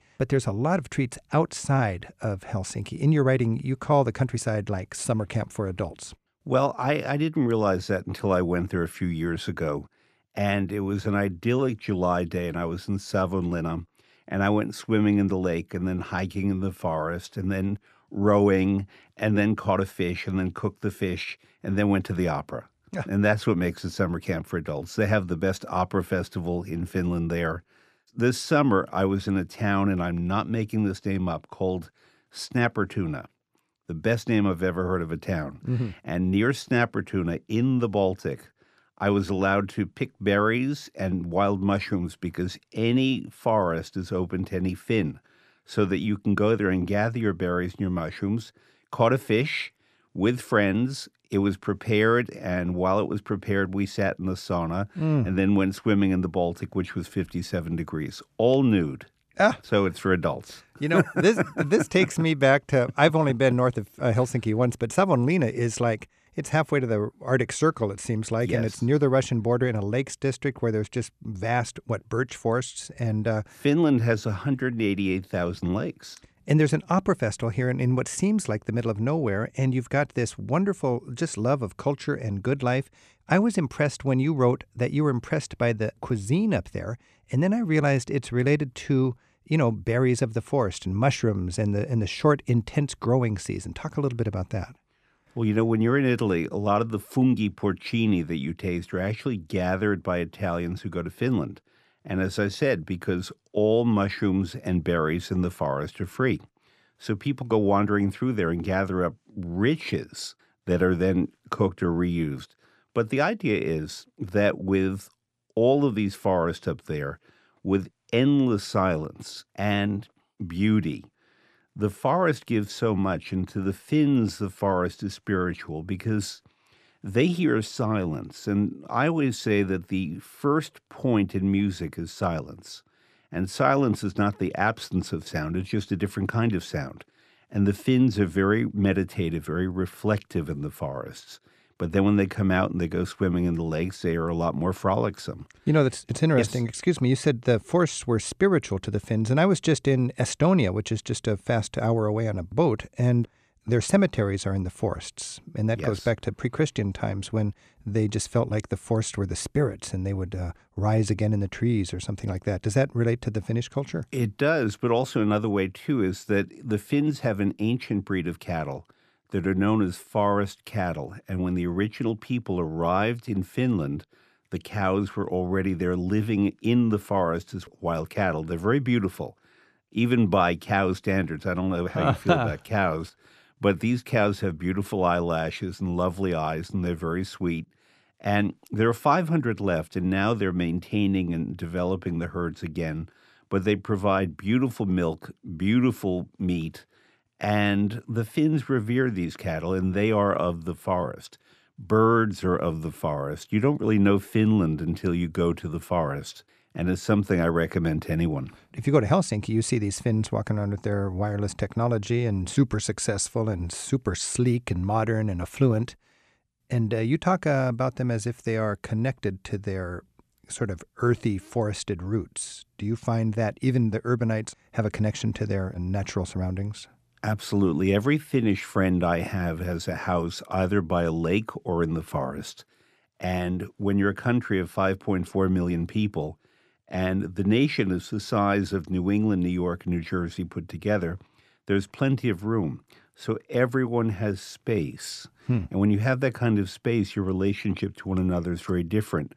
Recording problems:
none

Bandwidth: 14.5 kHz